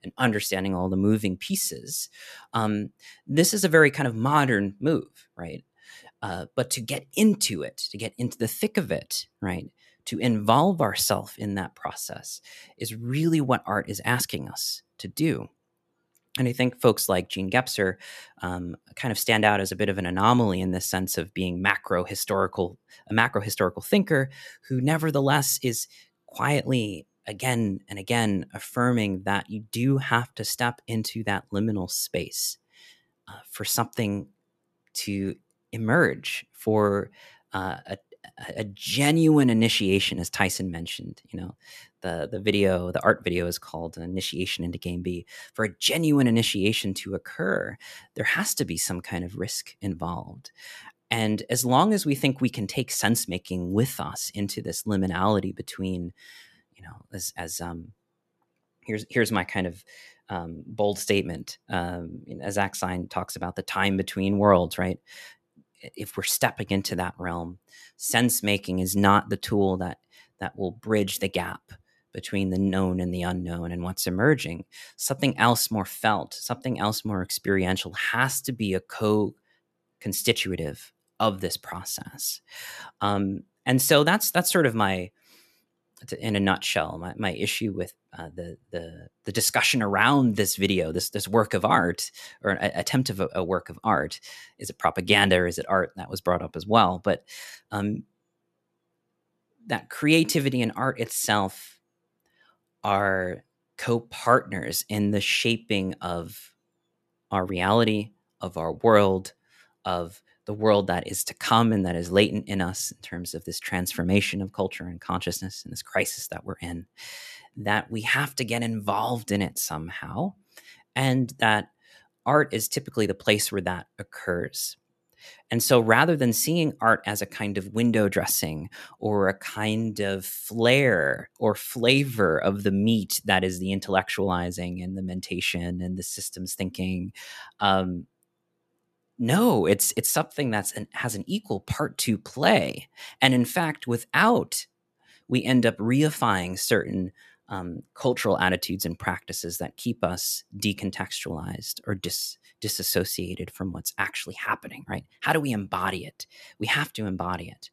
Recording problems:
none

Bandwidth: 13.5 kHz